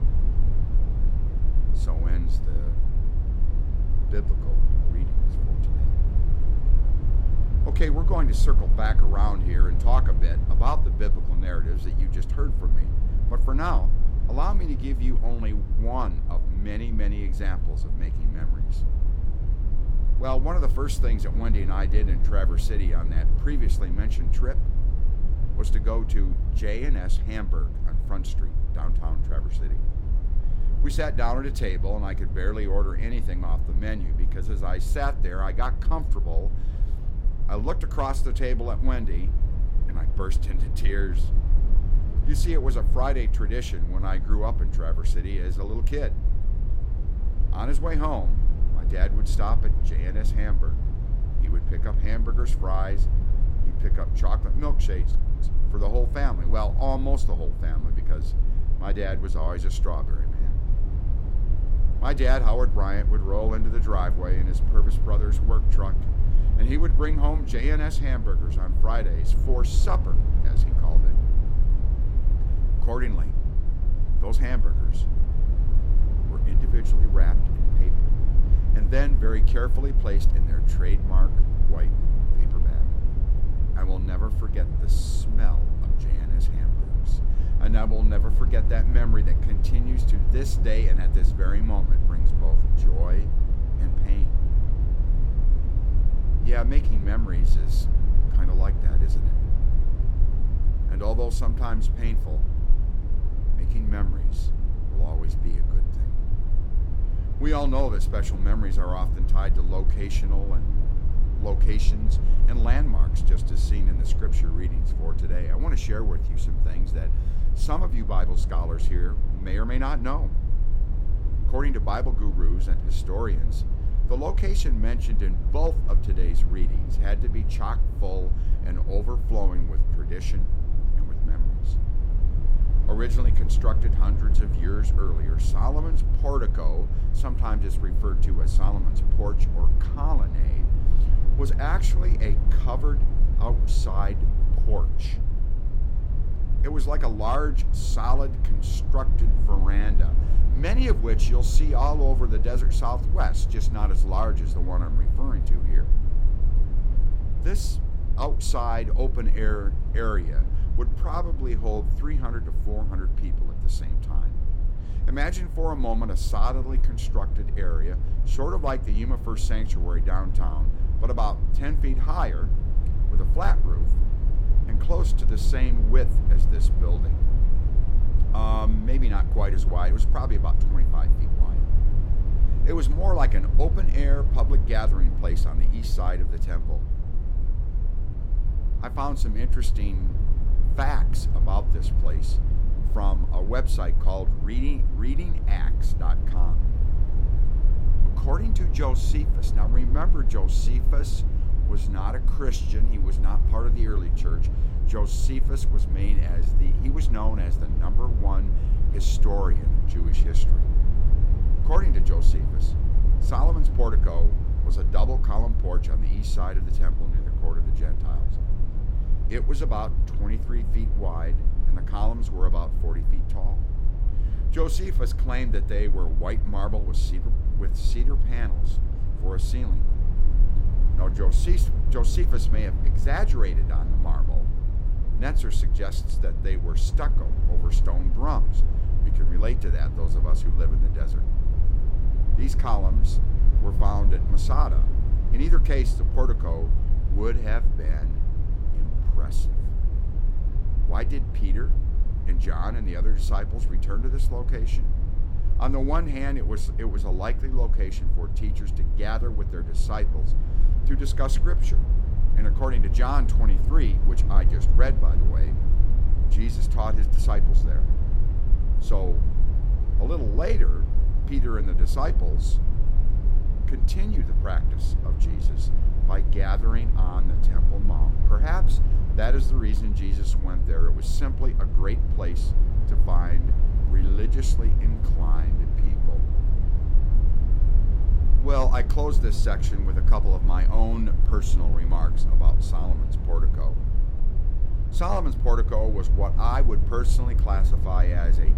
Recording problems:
low rumble; loud; throughout; 9 dB below the speech

